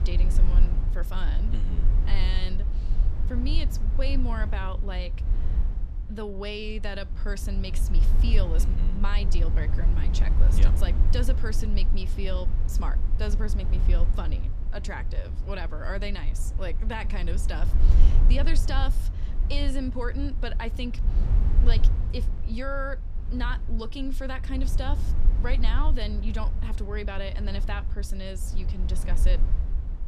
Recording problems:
low rumble; loud; throughout; 9 dB below the speech

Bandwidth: 14.5 kHz